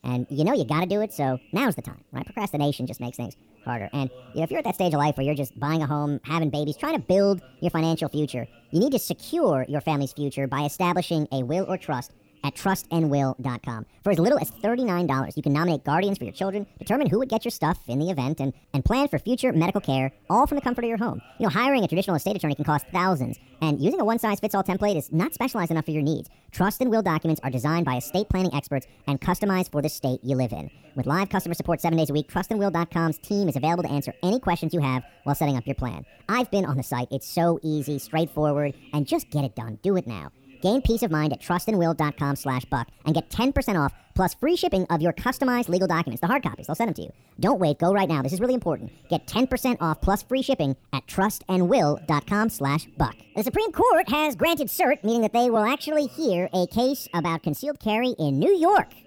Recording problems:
wrong speed and pitch; too fast and too high; 1.5 times normal speed
voice in the background; faint; throughout; 30 dB below the speech

